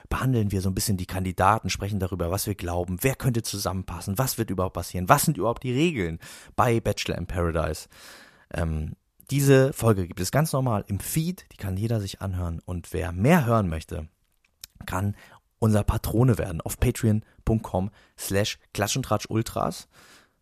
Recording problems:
none

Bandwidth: 14.5 kHz